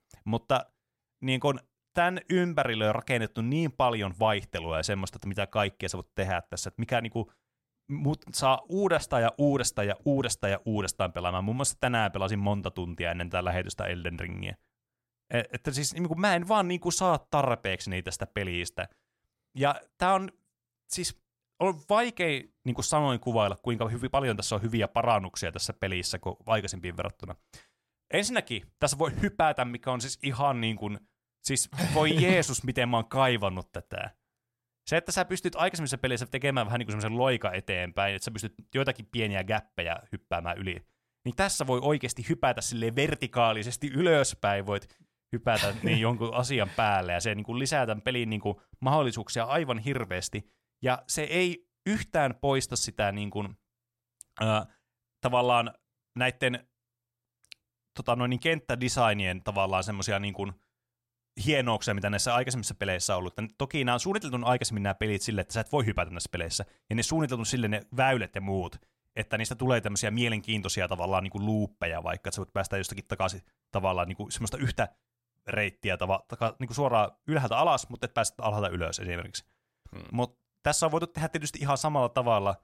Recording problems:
none

